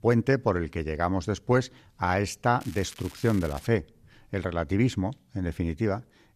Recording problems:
crackling; noticeable; at 2.5 s; 20 dB below the speech

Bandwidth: 14.5 kHz